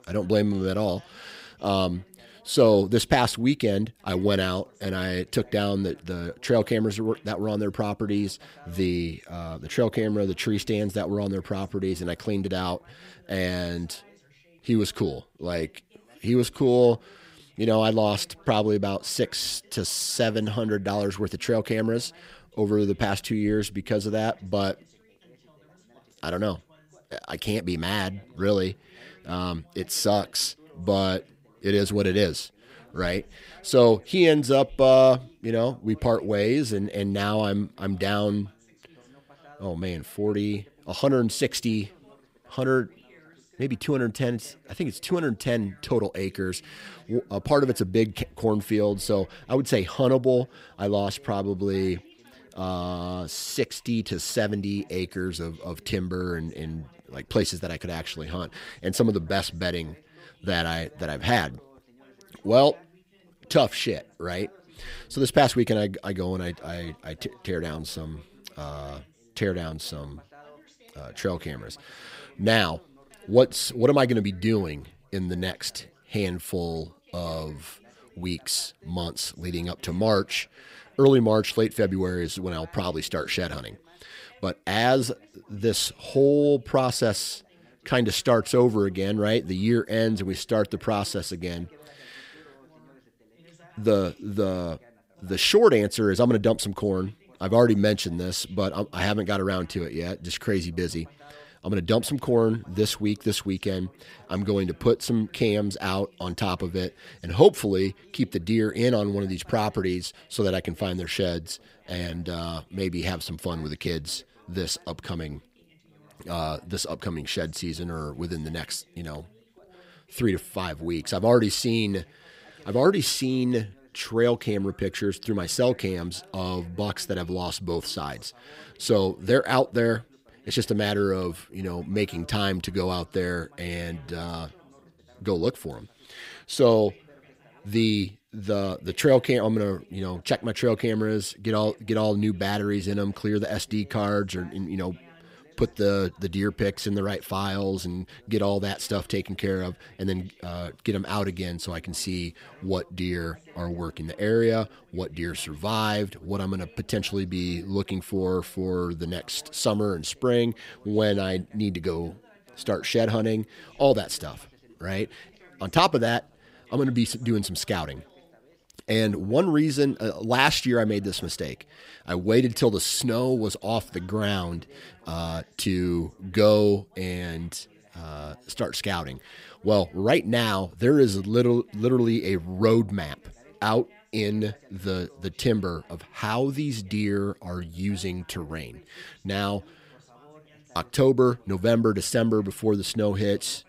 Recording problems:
background chatter; faint; throughout; 2 voices, 30 dB below the speech

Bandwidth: 15.5 kHz